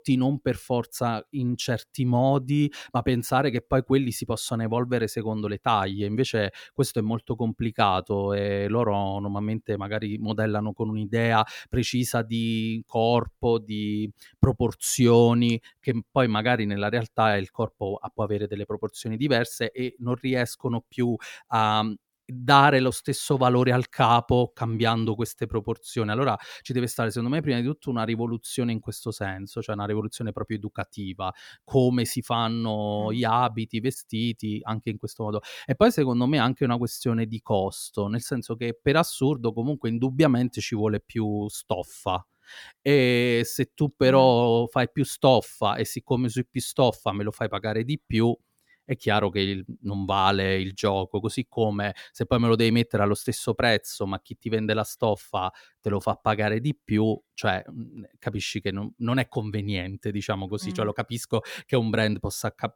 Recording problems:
none

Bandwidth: 18.5 kHz